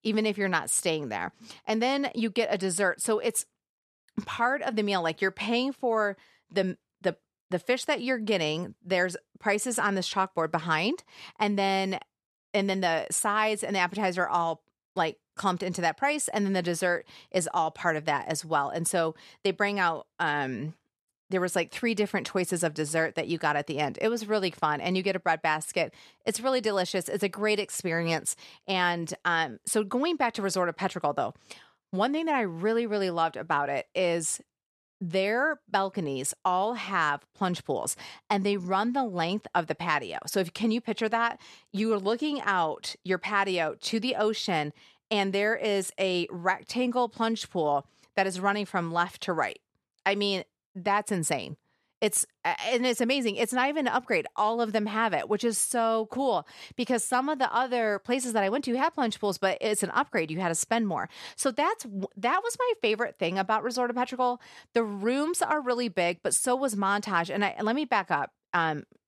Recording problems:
none

